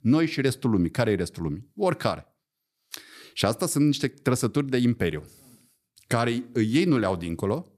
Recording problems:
none

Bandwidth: 14.5 kHz